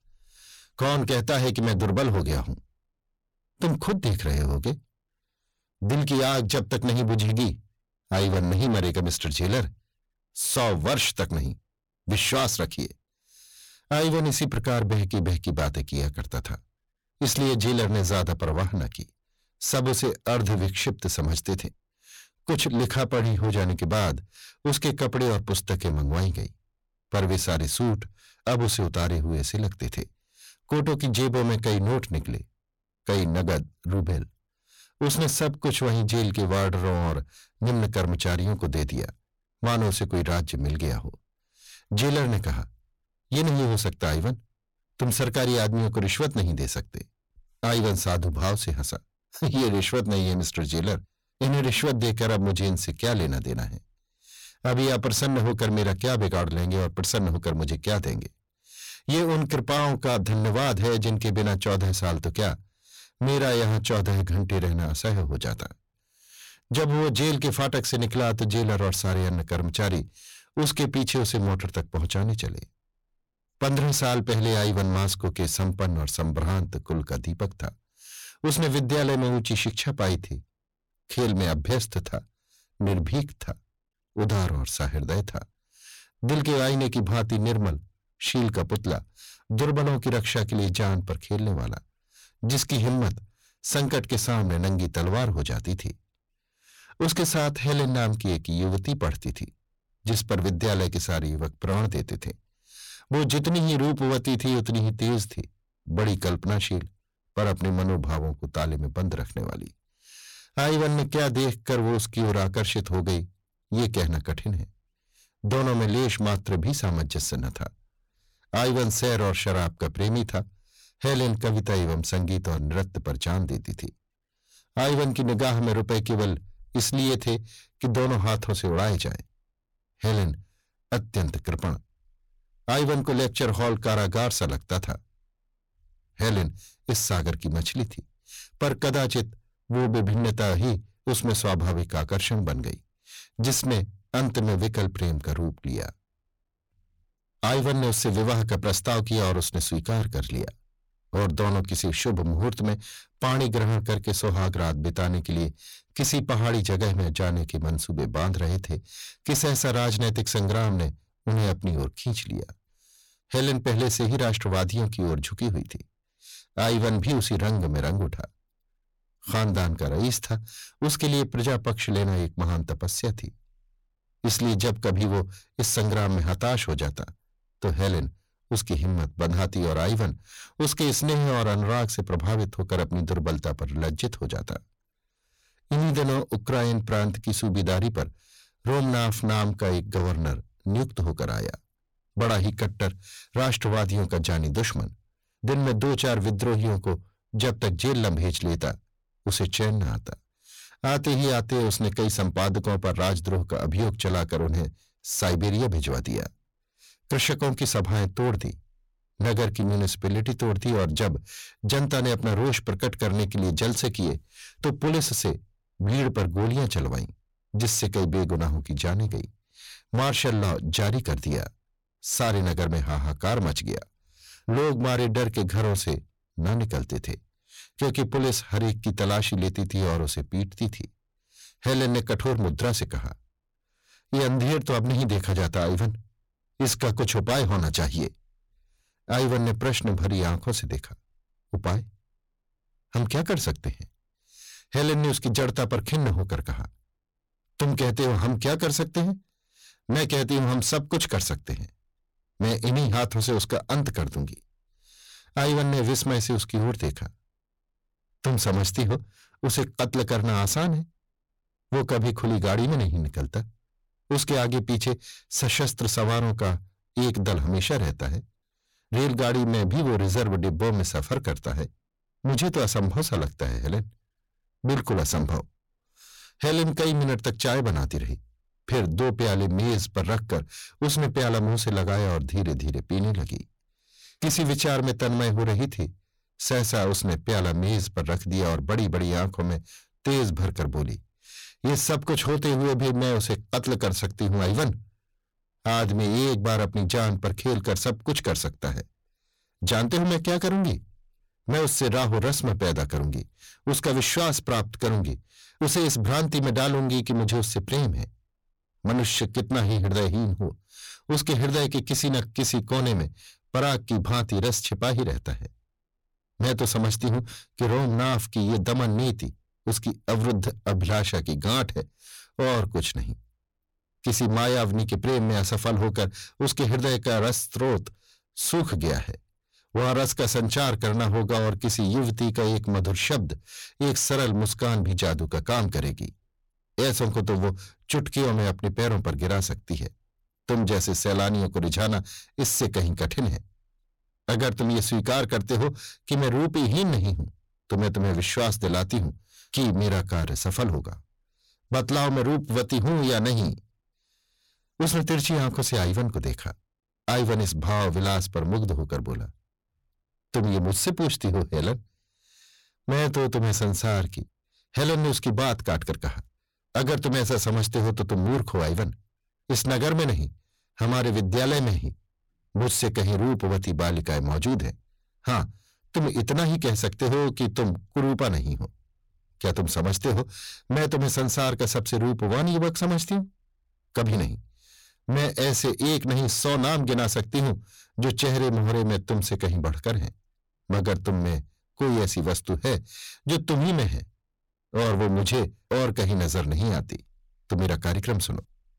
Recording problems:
distortion; heavy; 6 dB below the speech

